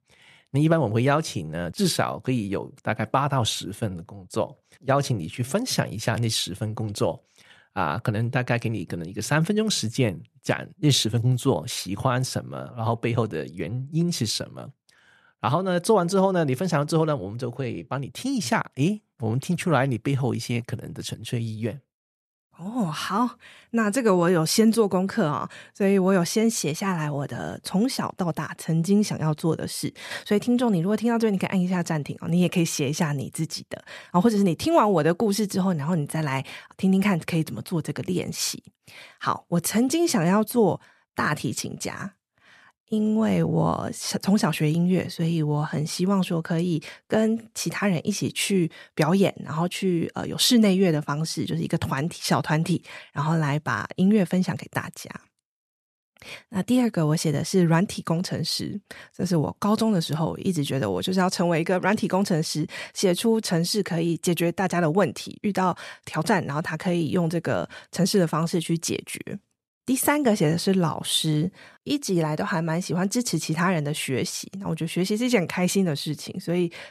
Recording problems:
none

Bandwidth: 13.5 kHz